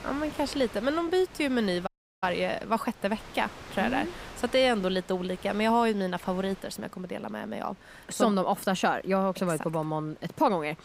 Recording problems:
wind noise on the microphone; occasional gusts; 20 dB below the speech
audio cutting out; at 2 s

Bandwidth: 15.5 kHz